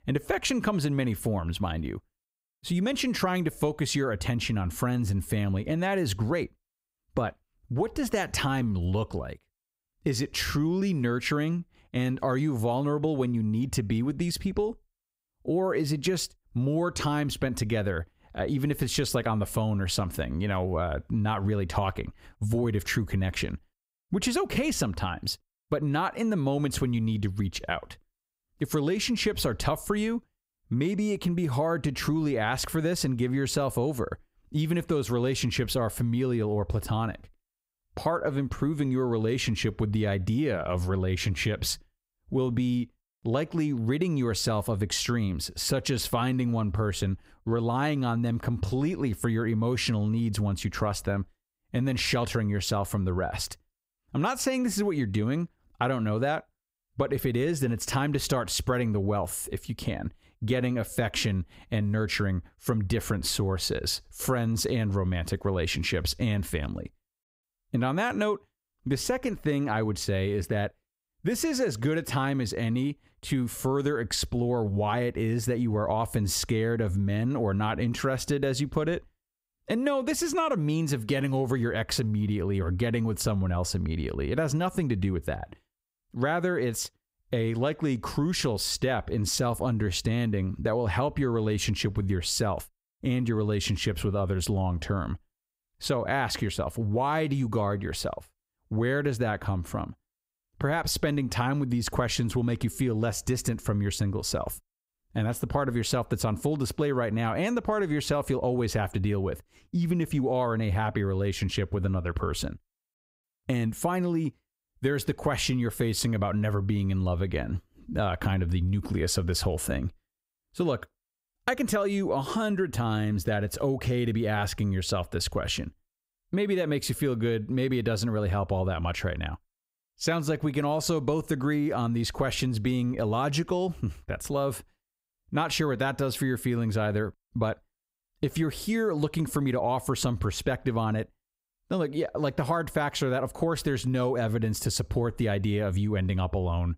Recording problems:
squashed, flat; somewhat

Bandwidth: 15.5 kHz